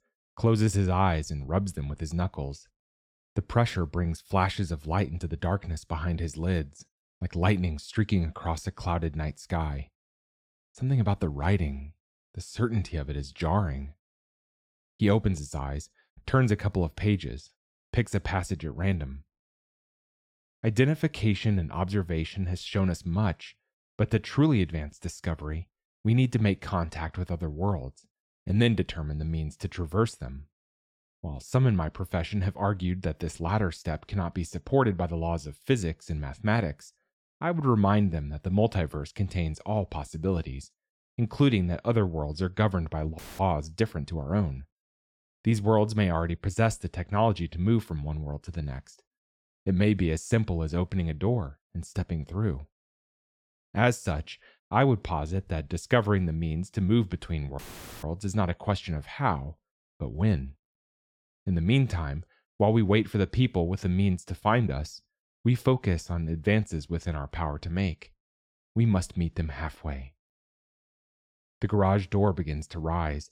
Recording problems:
audio cutting out; filled with static; at 43 s and at 58 s

